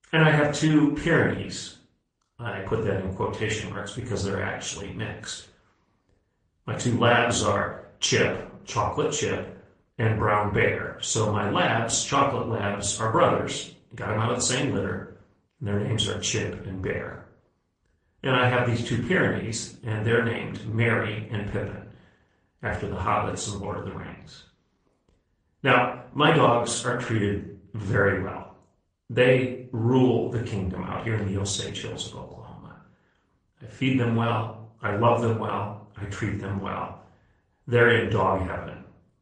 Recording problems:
room echo; noticeable; dies away in 0.4 s
off-mic speech; somewhat distant
garbled, watery; slightly; nothing above 8.5 kHz

